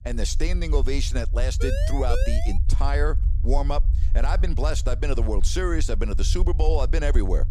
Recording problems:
low rumble; noticeable; throughout; 15 dB below the speech
siren; noticeable; at 1.5 s; peak 3 dB below the speech

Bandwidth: 15.5 kHz